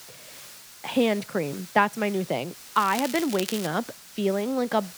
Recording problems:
crackling; loud; at 3 s; 9 dB below the speech
hiss; noticeable; throughout; 15 dB below the speech

